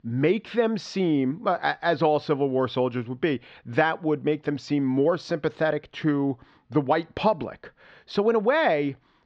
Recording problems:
muffled; slightly; fading above 4 kHz

